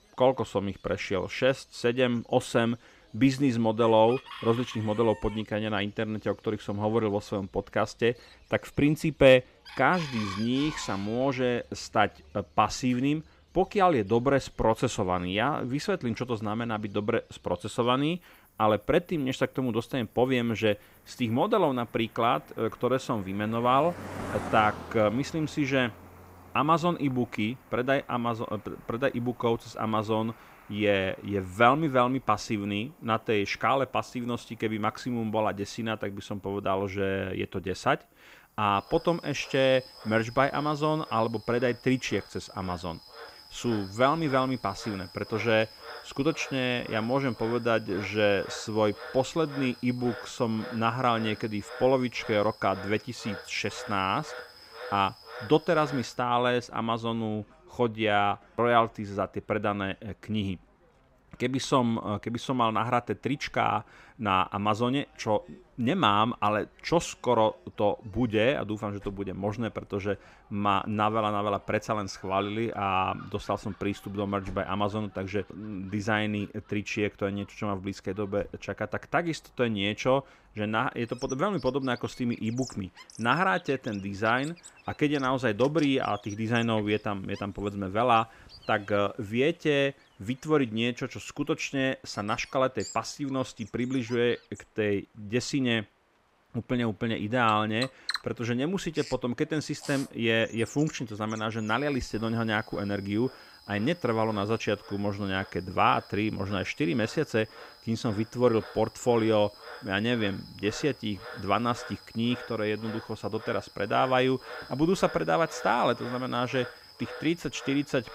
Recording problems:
animal sounds; noticeable; throughout; 15 dB below the speech

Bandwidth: 15.5 kHz